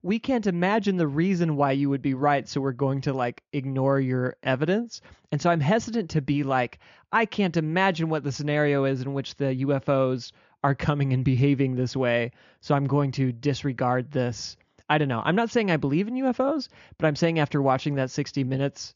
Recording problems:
high frequencies cut off; noticeable; nothing above 7 kHz

